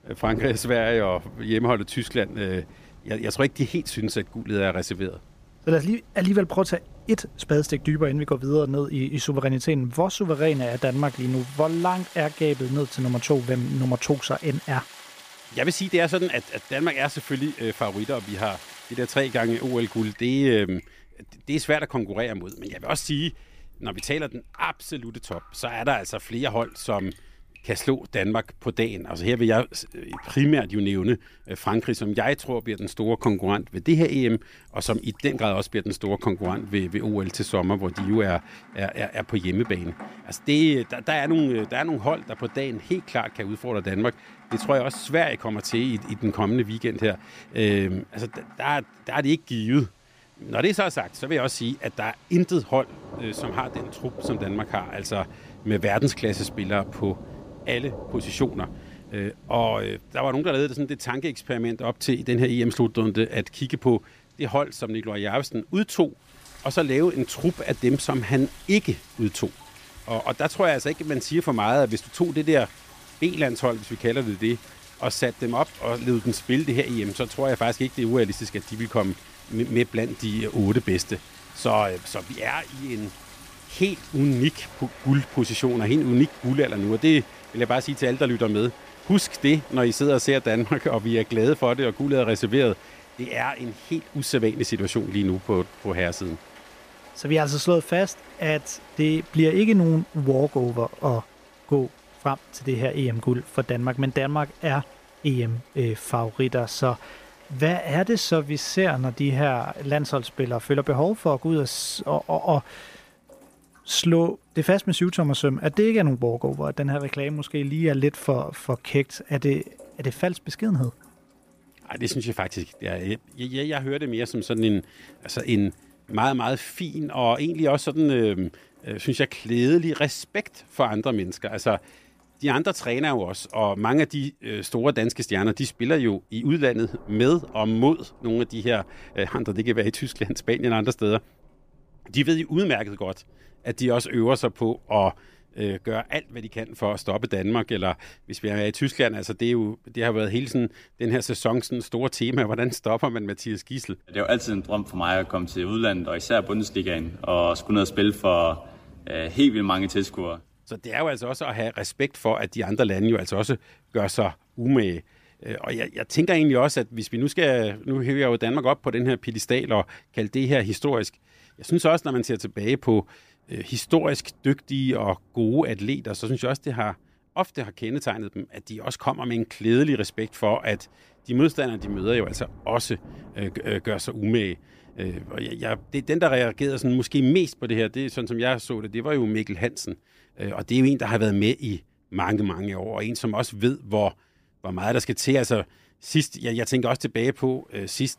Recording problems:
rain or running water; faint; throughout; 20 dB below the speech

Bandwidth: 15 kHz